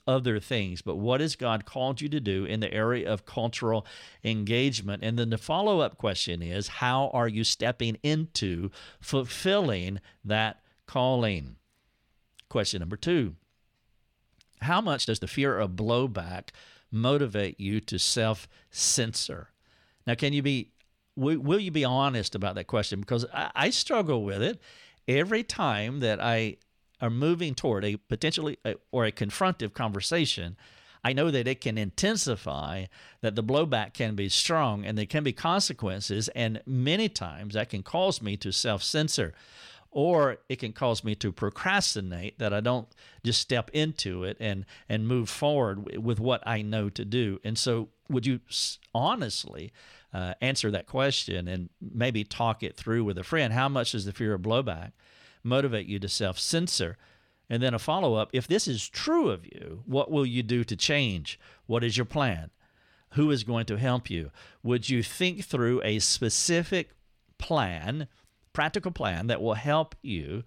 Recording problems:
uneven, jittery; strongly; from 4 s to 1:09

